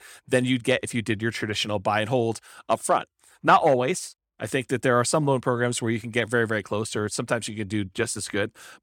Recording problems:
none

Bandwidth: 17 kHz